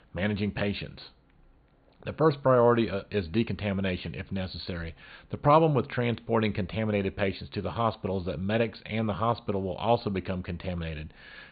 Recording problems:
high frequencies cut off; severe; nothing above 4.5 kHz

